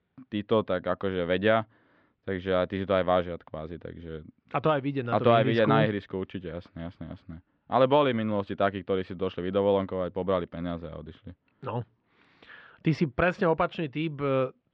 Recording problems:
muffled; very; fading above 3 kHz

